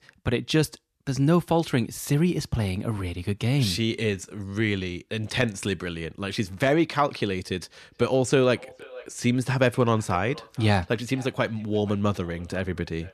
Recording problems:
echo of what is said; faint; from 8 s on; 470 ms later, 20 dB below the speech

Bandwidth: 14 kHz